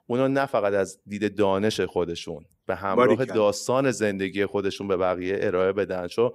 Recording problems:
none

